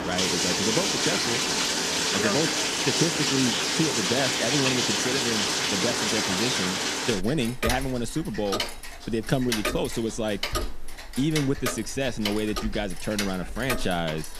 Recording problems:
household noises; very loud; throughout; 3 dB above the speech

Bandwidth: 14.5 kHz